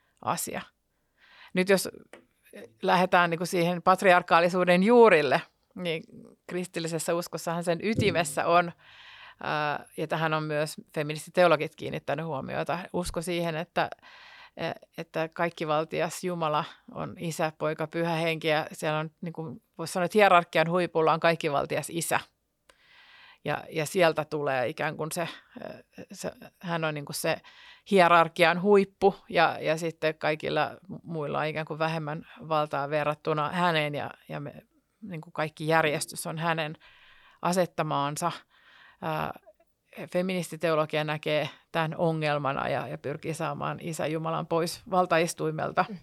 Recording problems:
none

